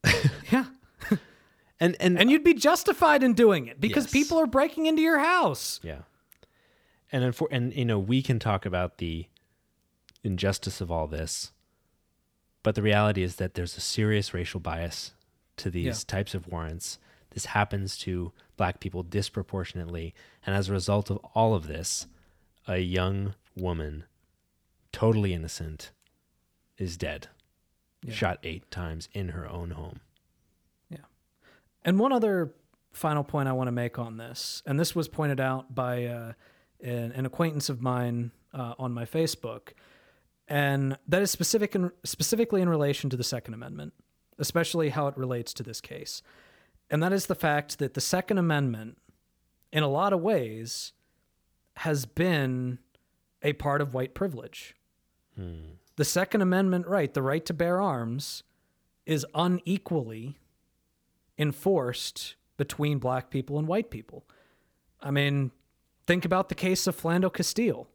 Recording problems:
none

